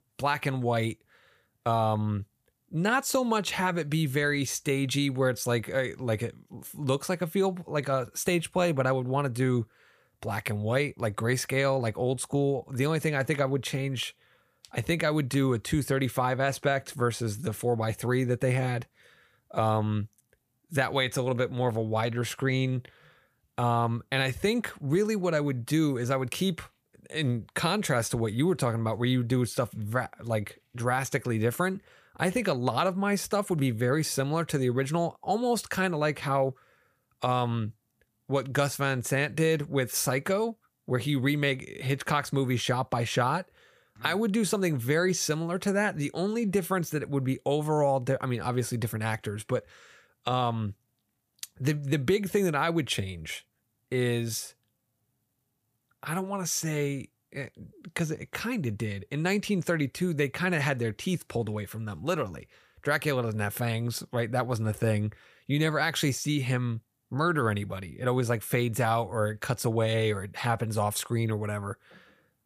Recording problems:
none

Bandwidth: 15 kHz